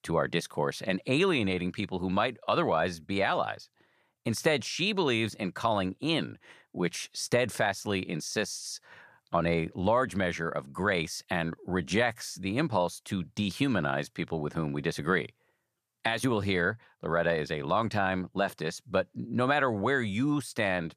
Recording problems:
none

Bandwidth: 14.5 kHz